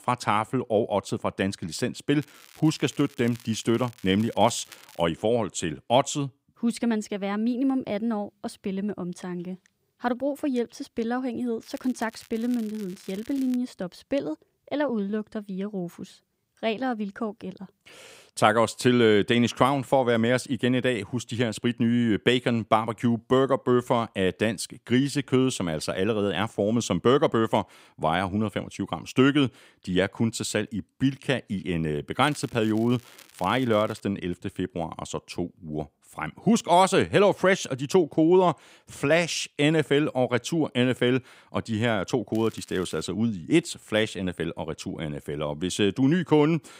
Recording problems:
crackling; faint; 4 times, first at 2 s; 25 dB below the speech

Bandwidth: 15.5 kHz